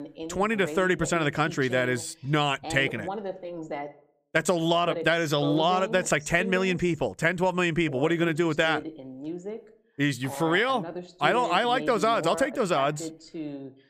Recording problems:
voice in the background; noticeable; throughout; 10 dB below the speech

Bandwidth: 15 kHz